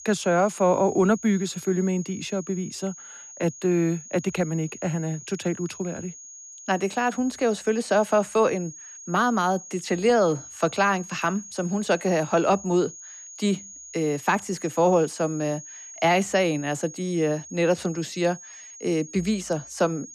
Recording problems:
high-pitched whine; noticeable; throughout; 6.5 kHz, 15 dB below the speech

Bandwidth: 13.5 kHz